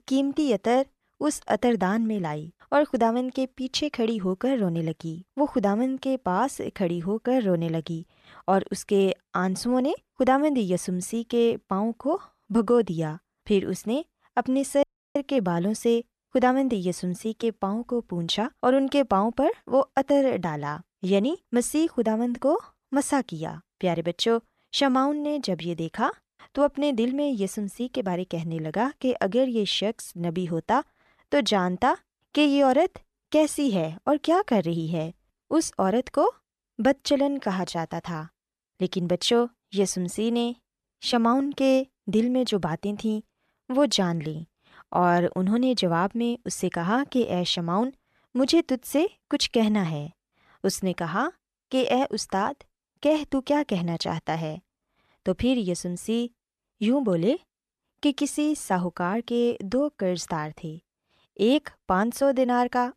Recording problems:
audio cutting out; at 15 s

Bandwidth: 13.5 kHz